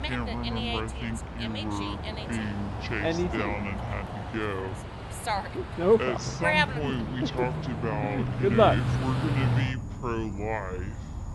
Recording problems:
wrong speed and pitch; too slow and too low; 0.6 times normal speed
animal sounds; very loud; throughout; 4 dB above the speech
background music; noticeable; throughout; 10 dB below the speech

